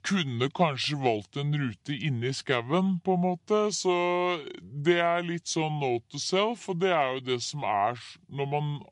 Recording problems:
wrong speed and pitch; too slow and too low; 0.7 times normal speed

